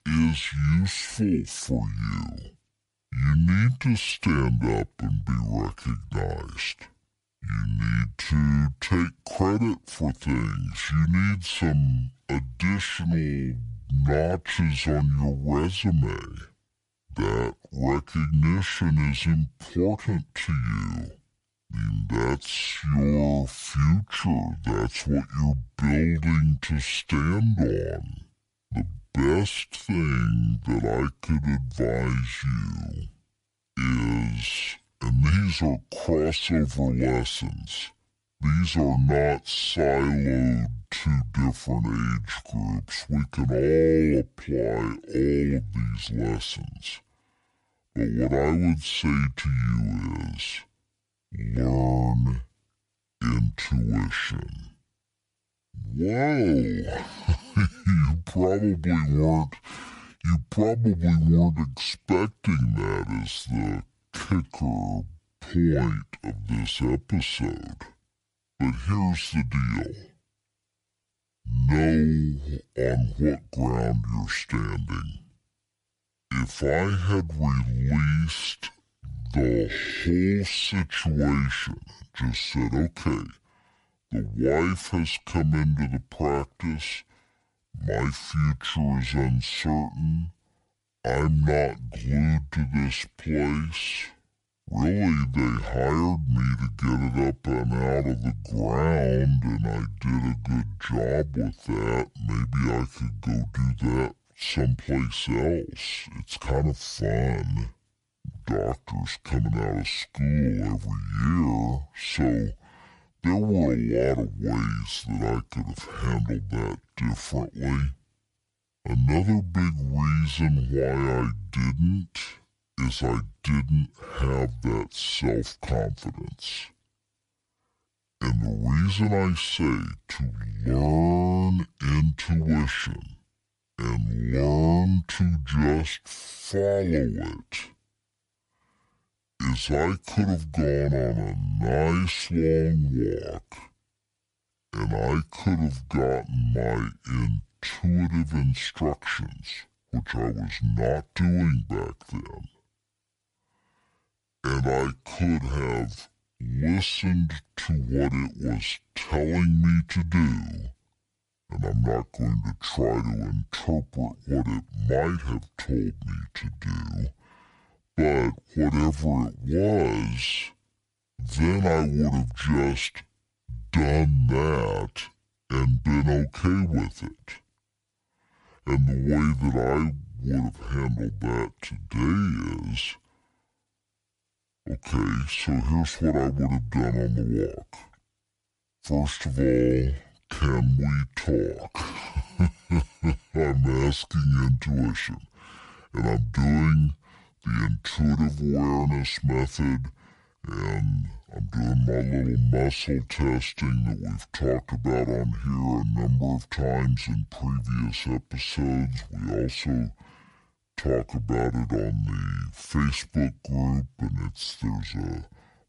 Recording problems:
wrong speed and pitch; too slow and too low; 0.6 times normal speed

